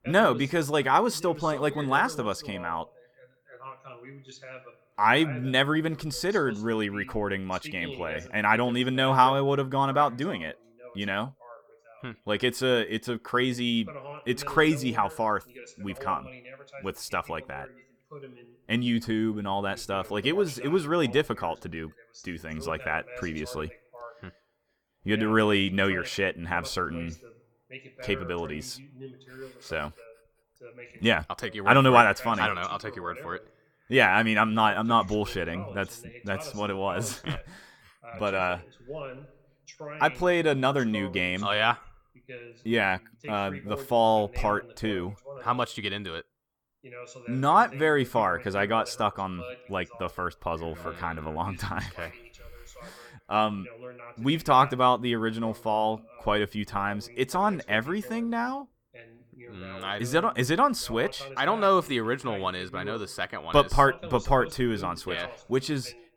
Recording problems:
voice in the background; noticeable; throughout; 20 dB below the speech

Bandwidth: 18.5 kHz